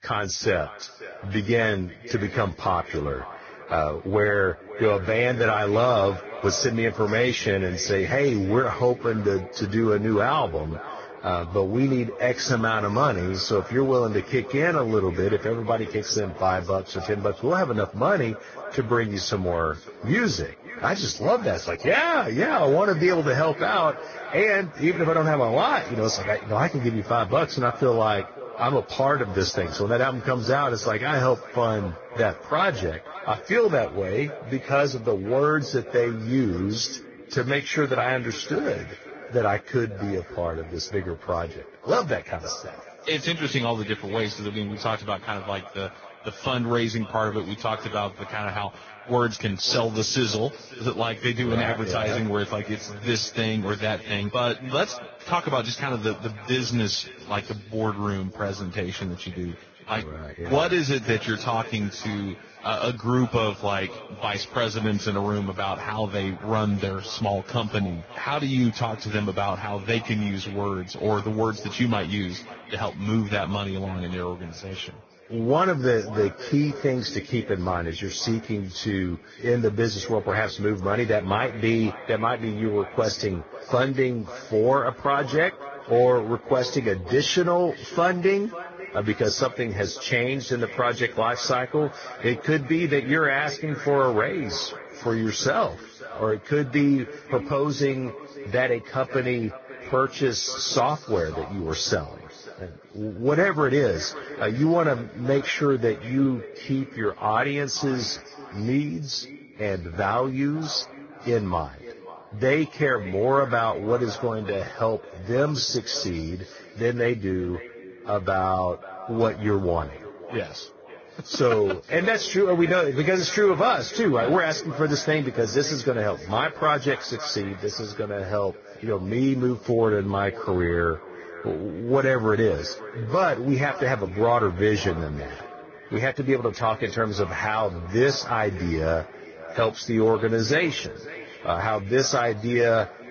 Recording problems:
garbled, watery; badly; nothing above 6.5 kHz
echo of what is said; noticeable; throughout; 550 ms later, 15 dB below the speech

